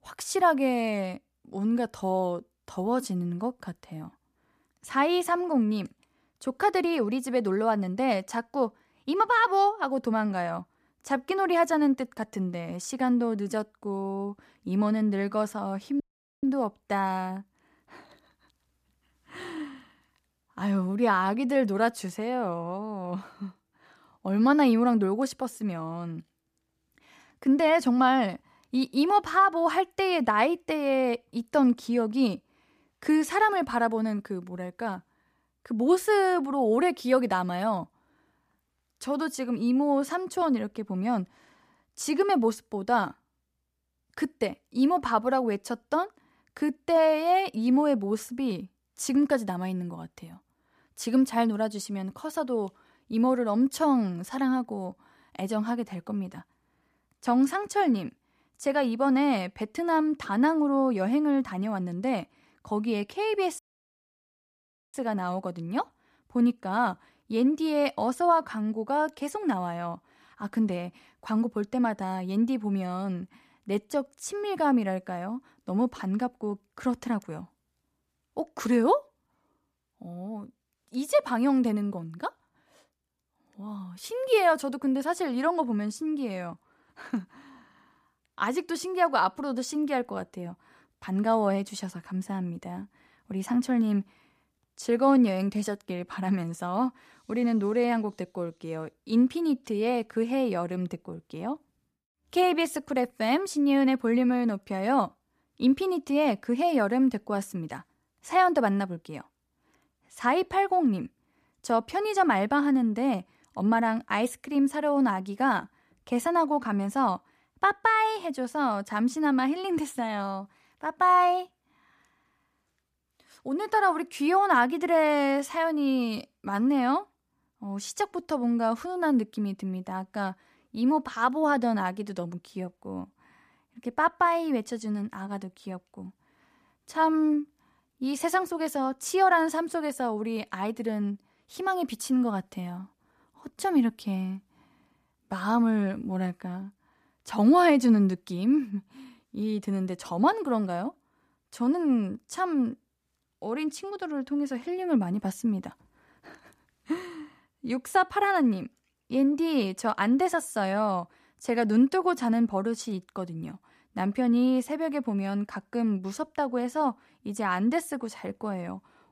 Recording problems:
audio cutting out; at 16 s and at 1:04 for 1.5 s

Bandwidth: 14.5 kHz